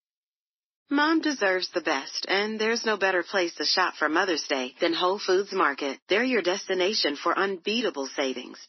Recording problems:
thin; somewhat; fading below 300 Hz
garbled, watery; slightly; nothing above 6 kHz

